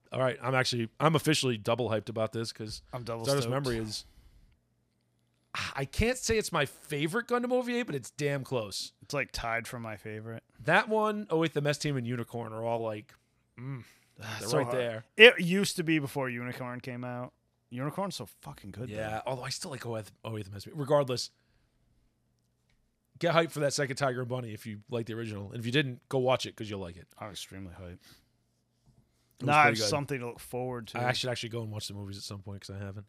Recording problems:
none

